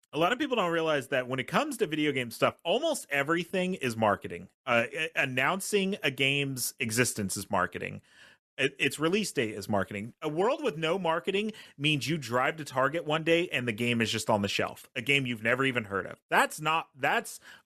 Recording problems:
none

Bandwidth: 13.5 kHz